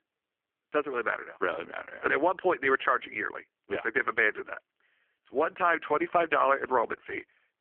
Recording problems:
phone-call audio; poor line

